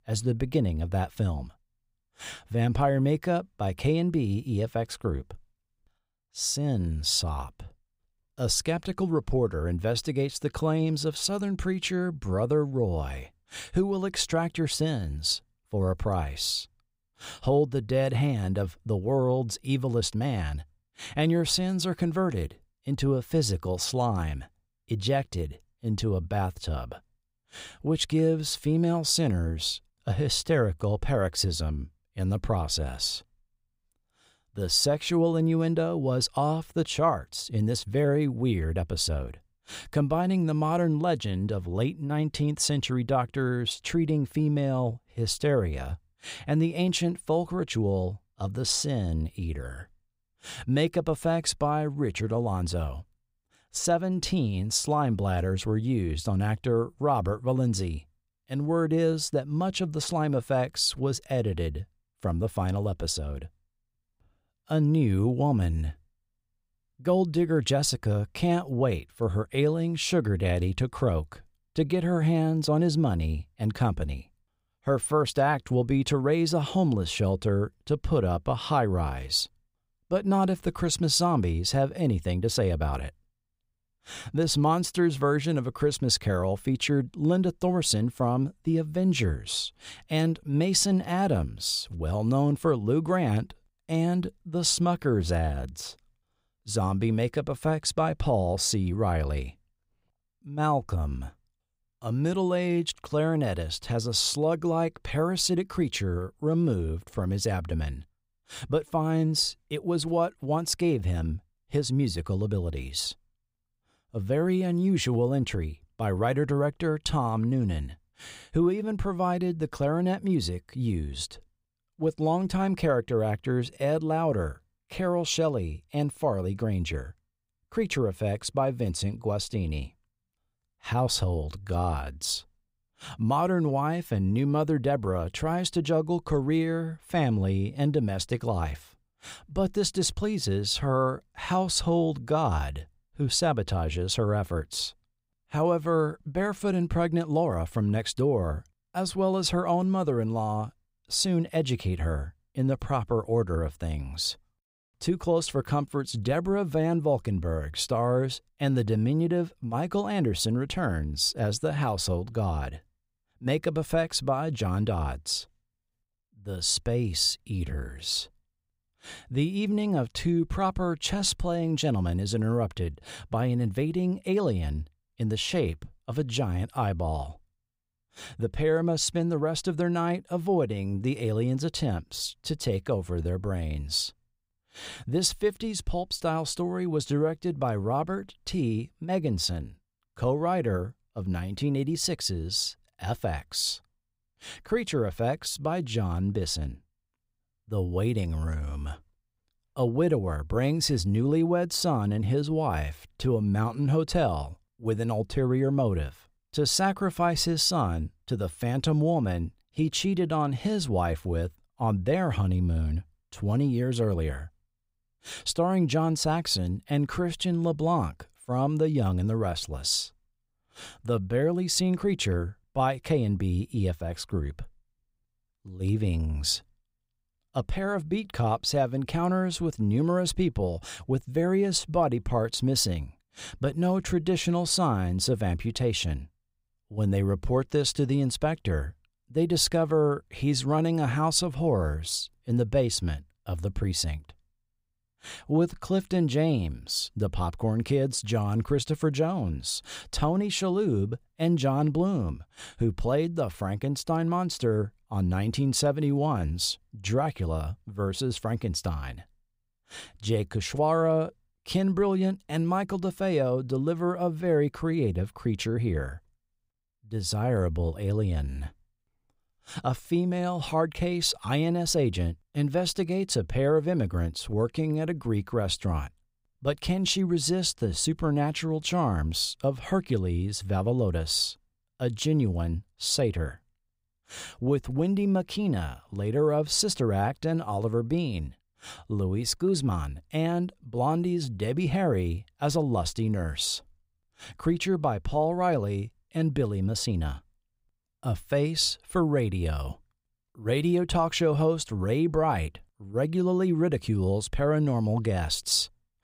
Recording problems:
none

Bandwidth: 15.5 kHz